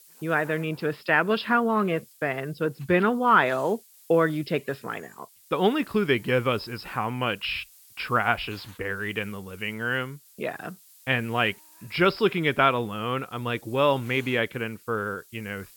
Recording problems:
high frequencies cut off; noticeable; nothing above 5.5 kHz
hiss; faint; throughout; 25 dB below the speech

